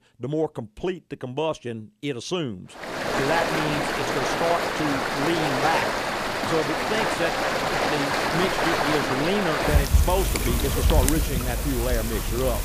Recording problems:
rain or running water; very loud; from 3 s on; 4 dB above the speech

